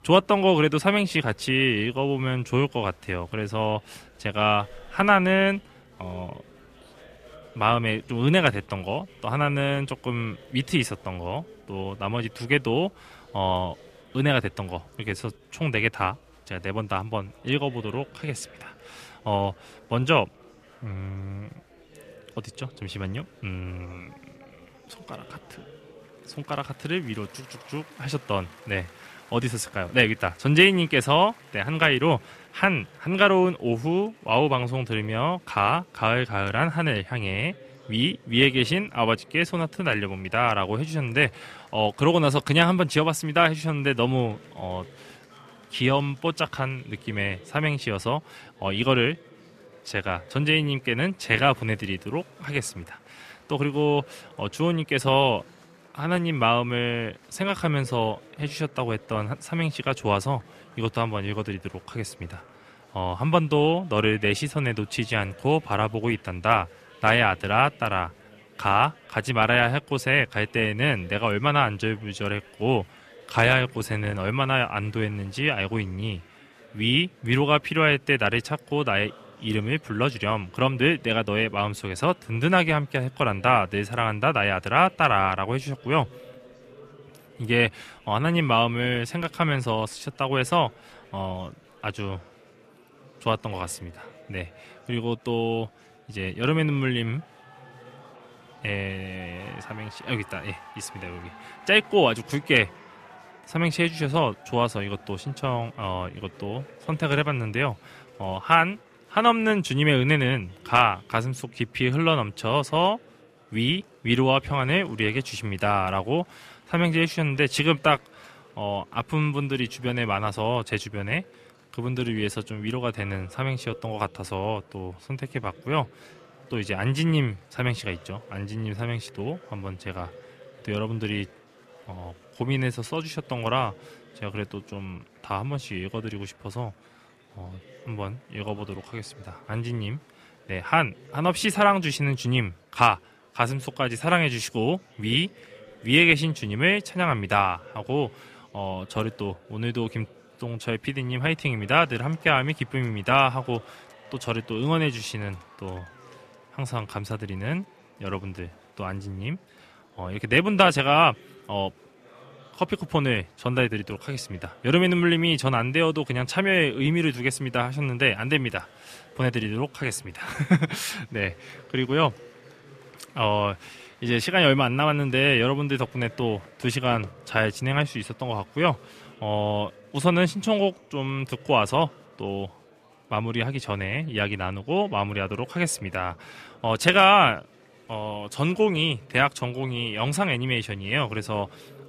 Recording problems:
murmuring crowd; faint; throughout; 25 dB below the speech

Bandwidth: 14.5 kHz